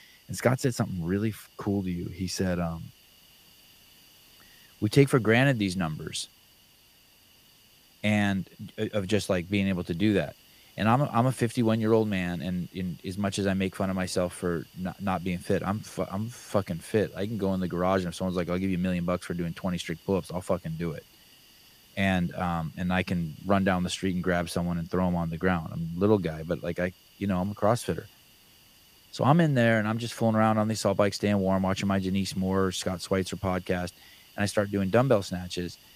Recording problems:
hiss; faint; throughout; 25 dB below the speech

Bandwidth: 15 kHz